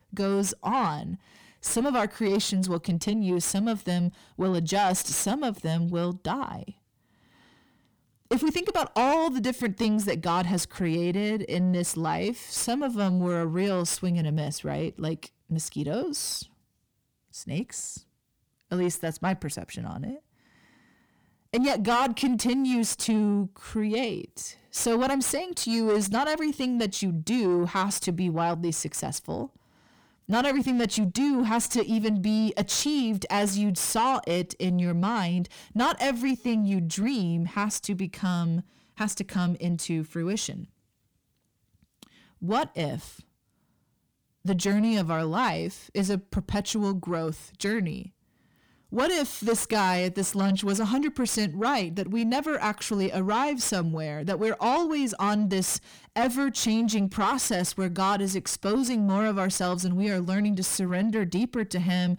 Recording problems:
distortion; slight; 9 dB below the speech

